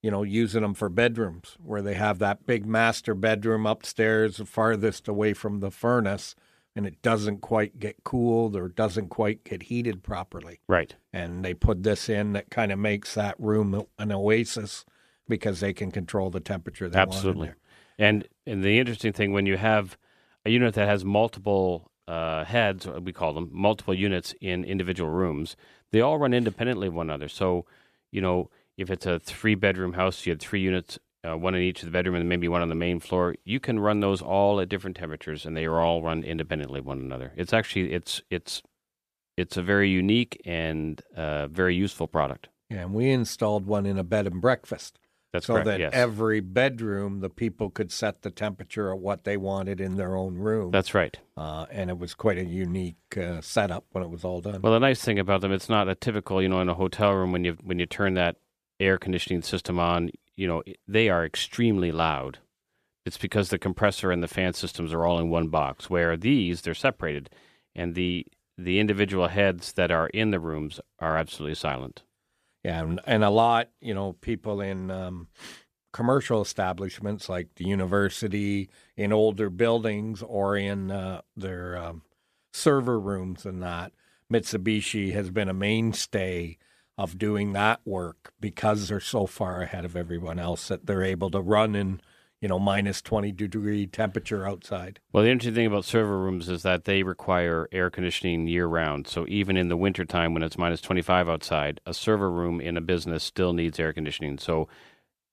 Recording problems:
none

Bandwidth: 14.5 kHz